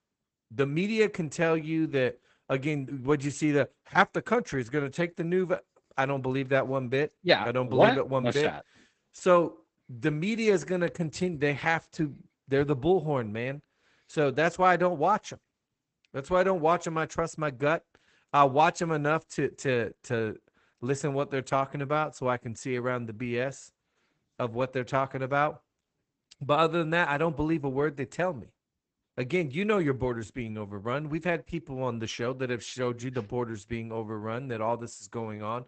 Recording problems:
garbled, watery; badly; nothing above 8 kHz

